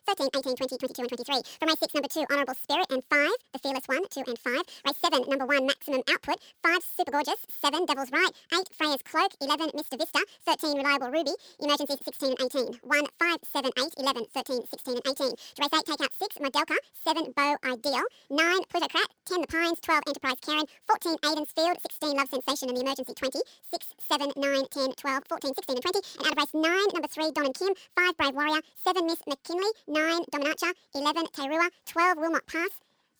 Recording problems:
wrong speed and pitch; too fast and too high; 1.7 times normal speed

